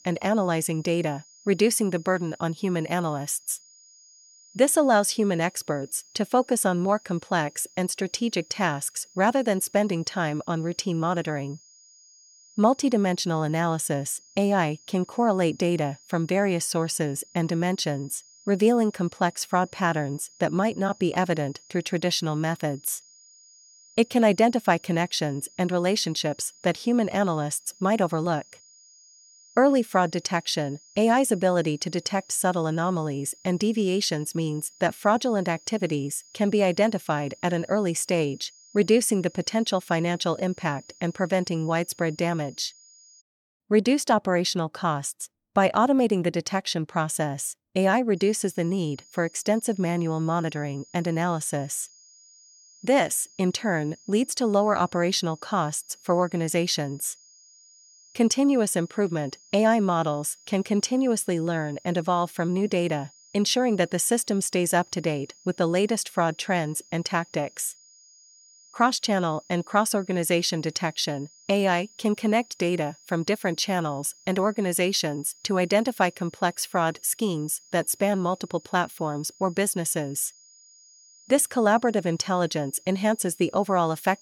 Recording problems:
high-pitched whine; faint; until 43 s and from 48 s on; 6.5 kHz, 25 dB below the speech

